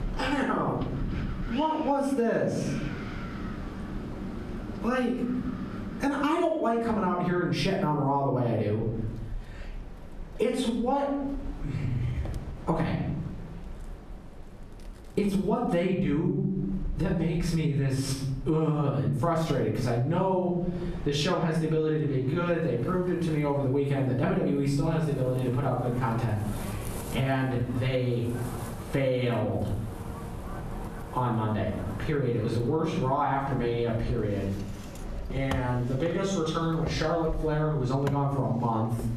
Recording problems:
off-mic speech; far
squashed, flat; heavily, background pumping
room echo; noticeable; dies away in 0.6 s
wind in the background; noticeable; throughout; 15 dB below the speech

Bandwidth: 14 kHz